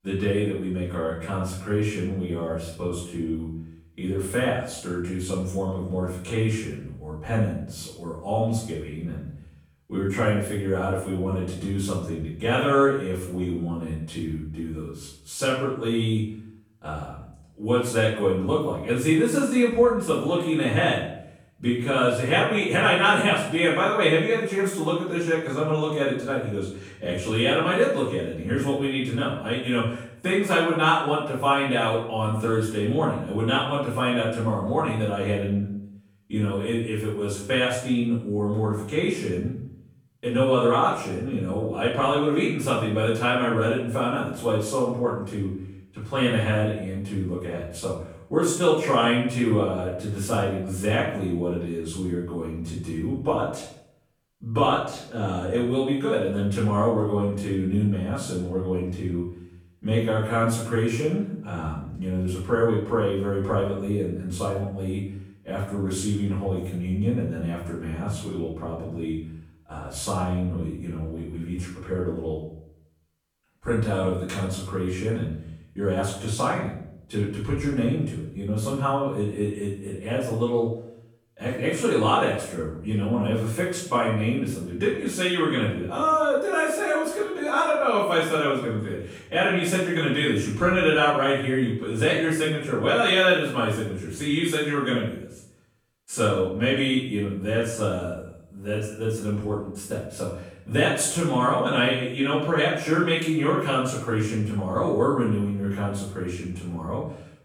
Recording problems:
off-mic speech; far
room echo; noticeable; dies away in 0.6 s

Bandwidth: 18.5 kHz